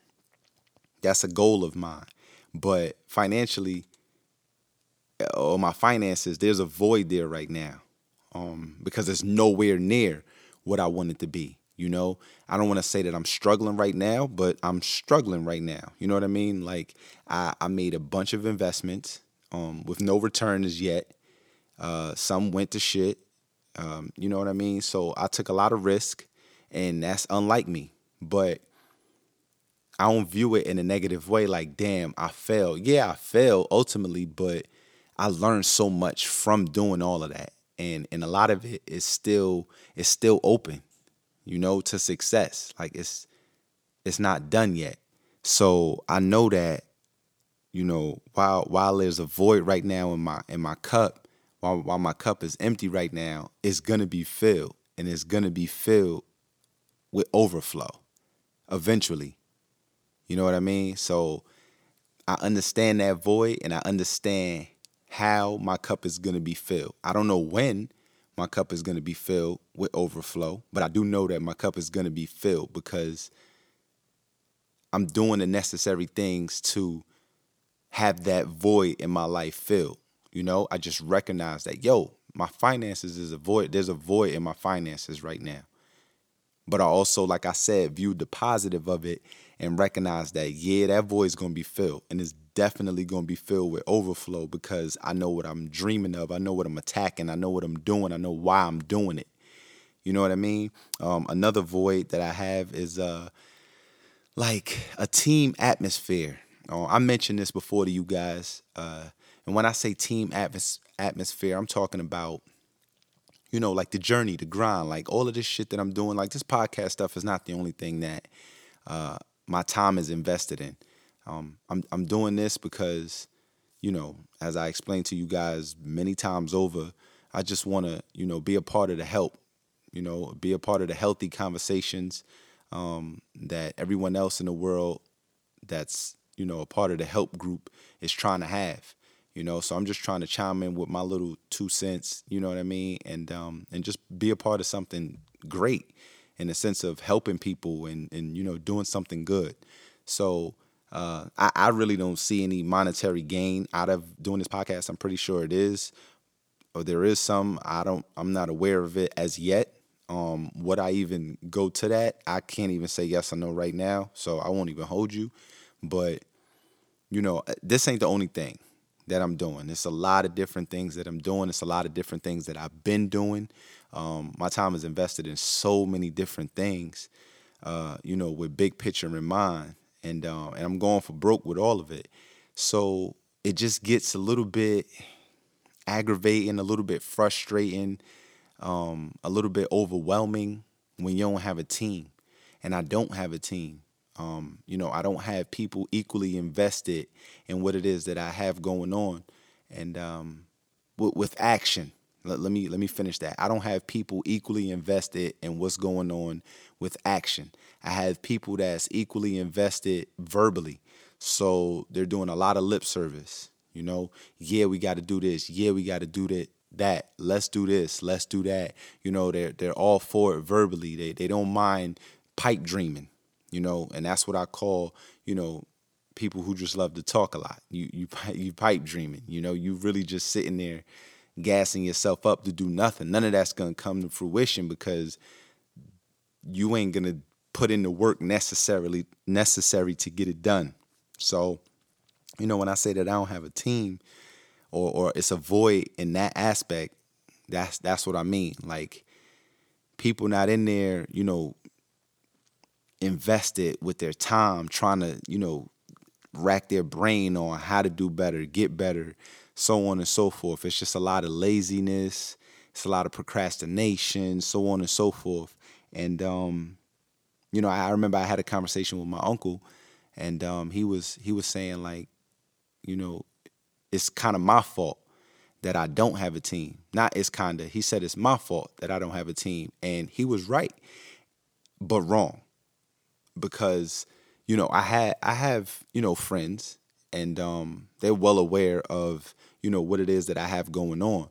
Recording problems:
uneven, jittery; strongly; from 1:11 to 3:32

